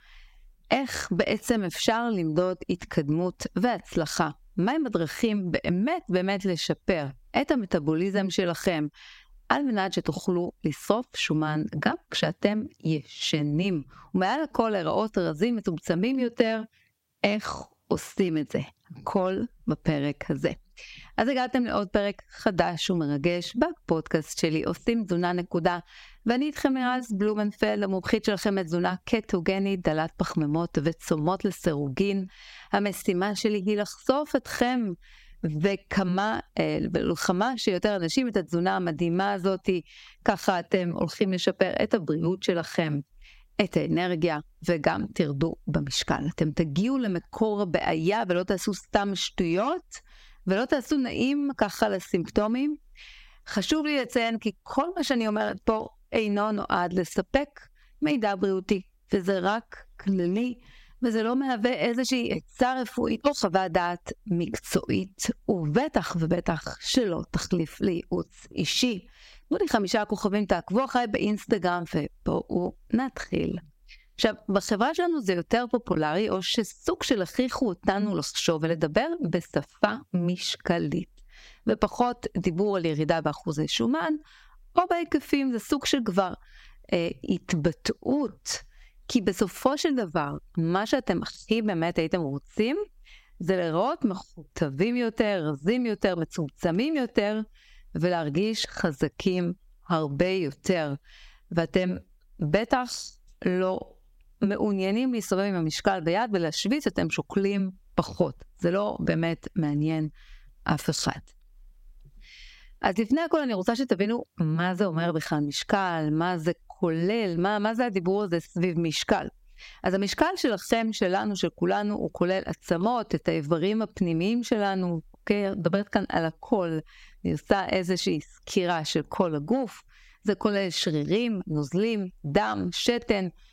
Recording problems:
squashed, flat; somewhat

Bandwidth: 16 kHz